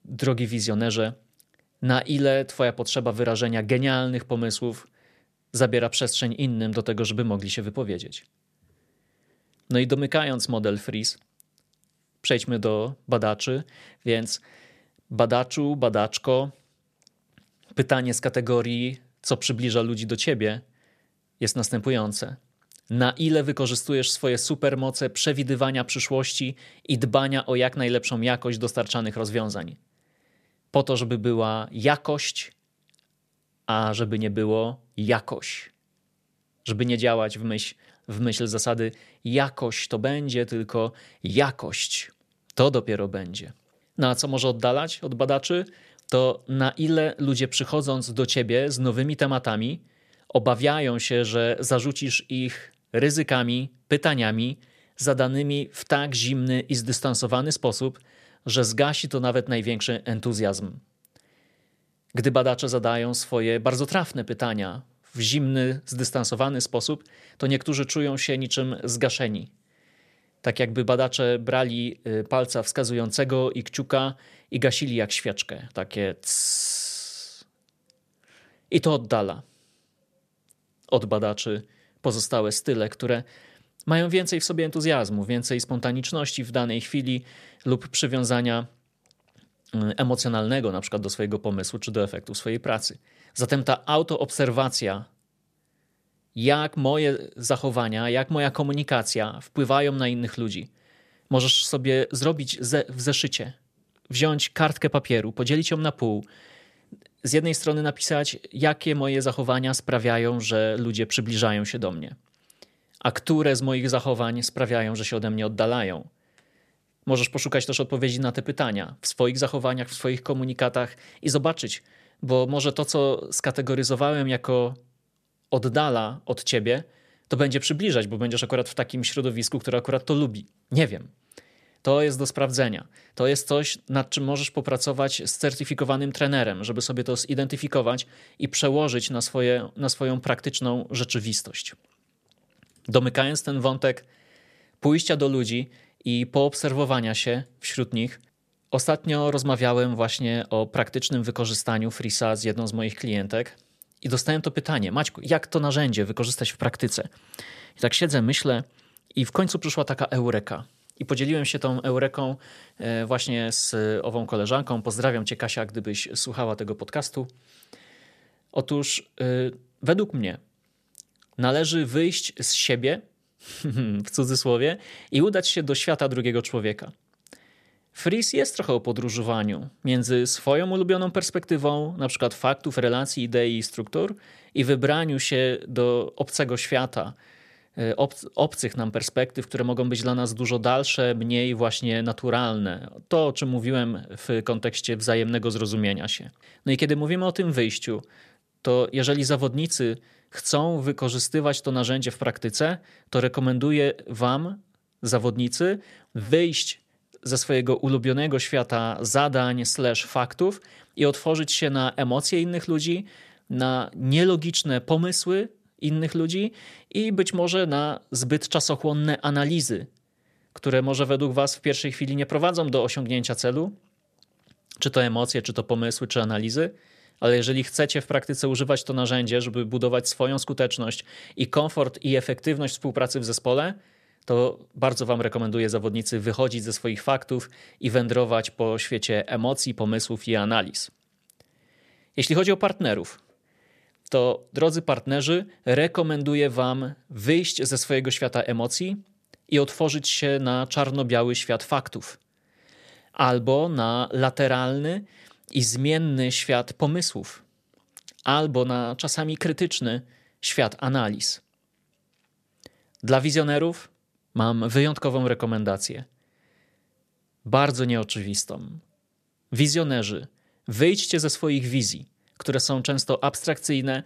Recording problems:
none

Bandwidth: 14.5 kHz